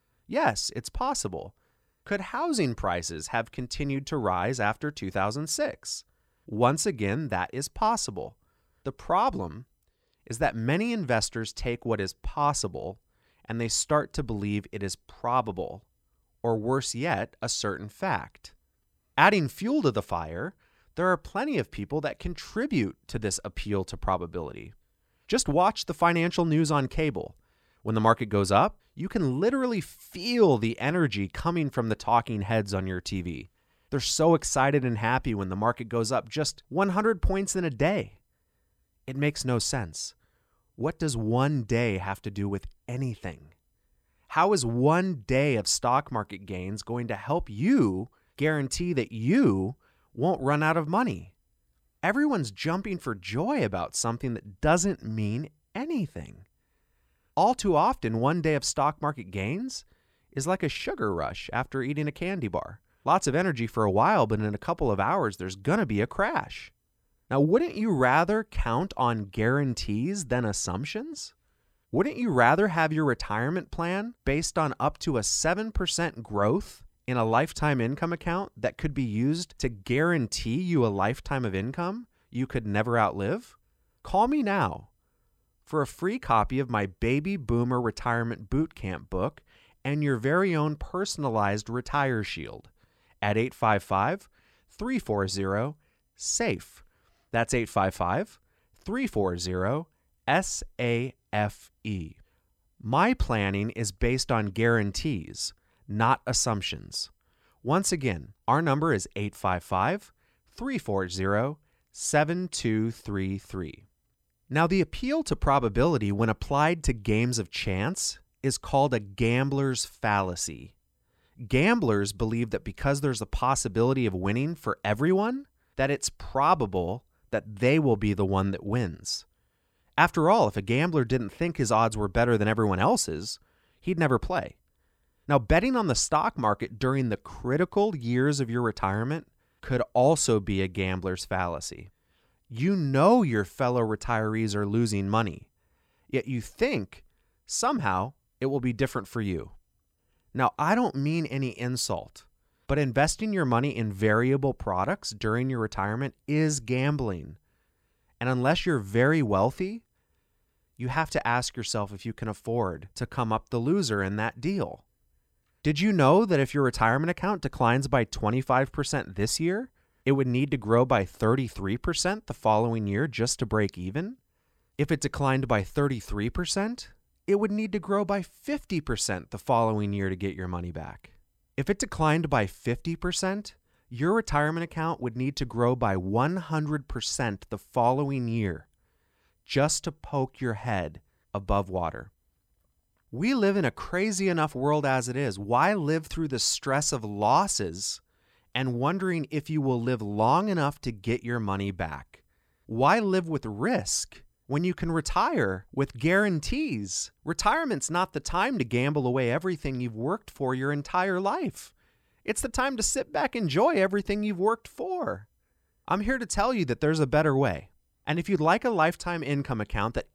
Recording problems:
none

